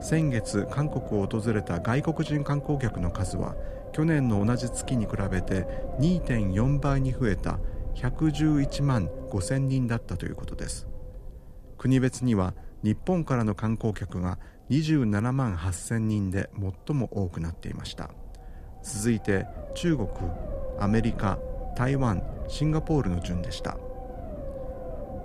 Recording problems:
low rumble; loud; throughout; 7 dB below the speech

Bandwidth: 14.5 kHz